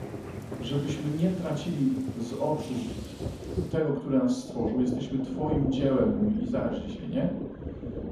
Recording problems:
off-mic speech; far
room echo; noticeable; dies away in 0.7 s
rain or running water; loud; throughout; 8 dB below the speech

